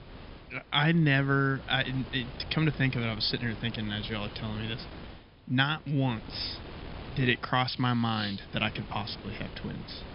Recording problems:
high frequencies cut off; noticeable; nothing above 5.5 kHz
wind noise on the microphone; occasional gusts; 15 dB below the speech

